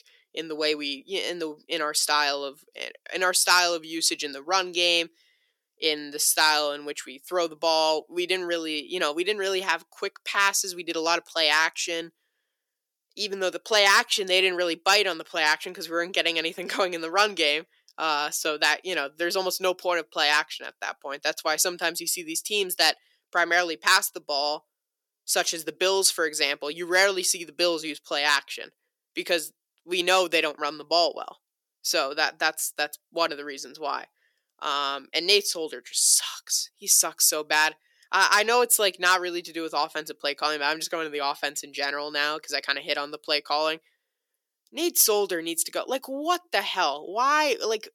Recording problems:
thin; very; fading below 350 Hz

